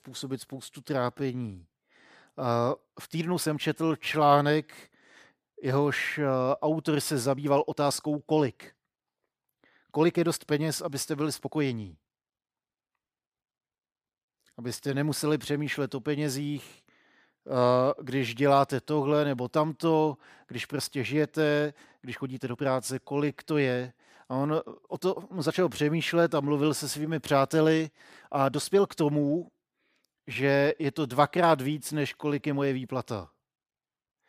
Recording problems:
uneven, jittery; strongly; from 1 to 32 s

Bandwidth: 15 kHz